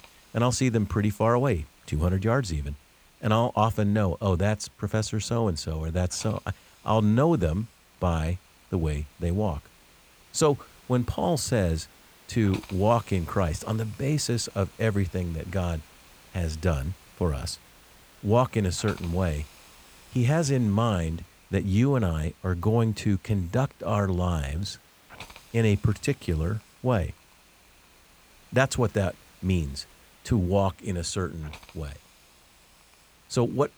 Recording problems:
hiss; faint; throughout; 25 dB below the speech

